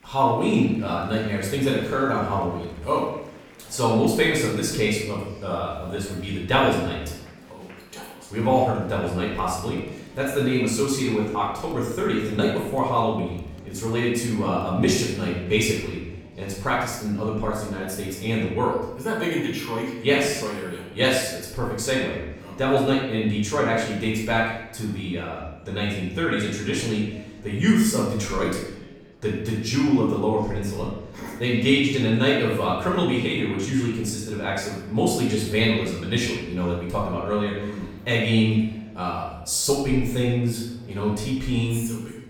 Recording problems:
off-mic speech; far
room echo; noticeable; dies away in 0.8 s
murmuring crowd; faint; throughout; 25 dB below the speech

